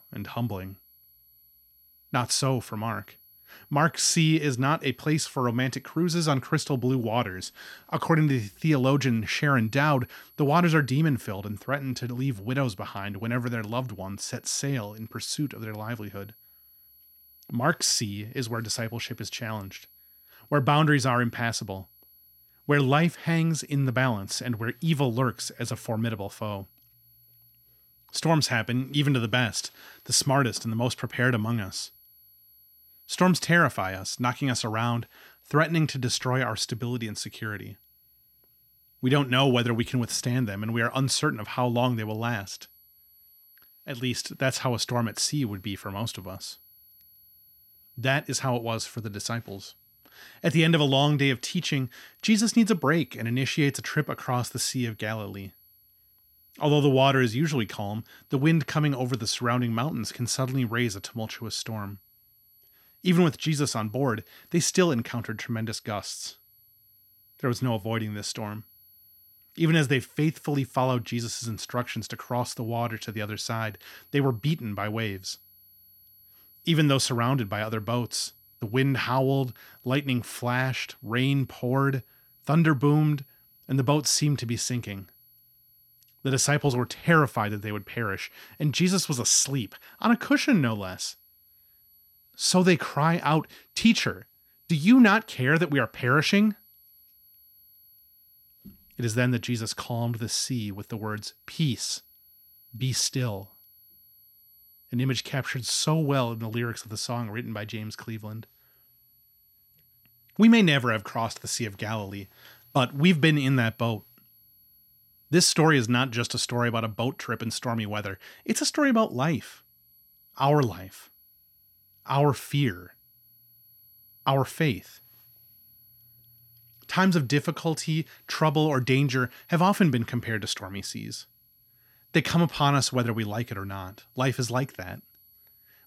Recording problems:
high-pitched whine; faint; throughout; 11.5 kHz, 30 dB below the speech

